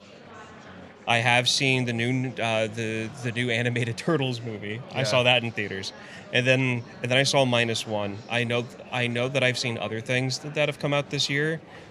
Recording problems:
murmuring crowd; faint; throughout; 20 dB below the speech

